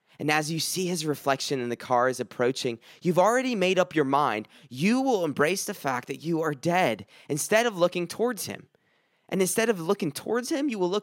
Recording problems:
none

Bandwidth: 16 kHz